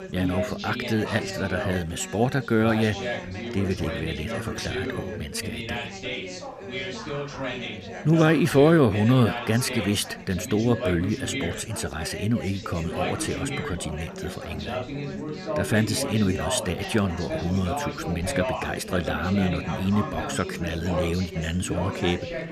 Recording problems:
background chatter; loud; throughout; 3 voices, 6 dB below the speech

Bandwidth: 14.5 kHz